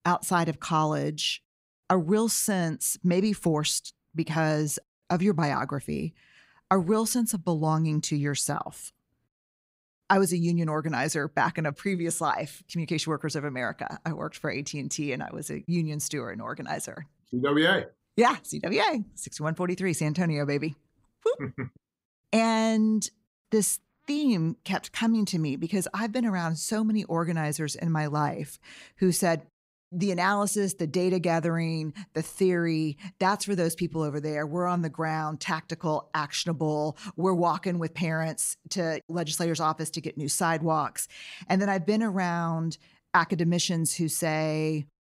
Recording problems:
none

